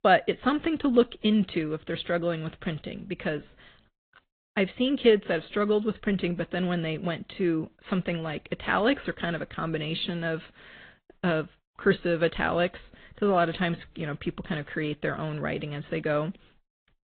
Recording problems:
high frequencies cut off; severe; nothing above 4 kHz
garbled, watery; slightly

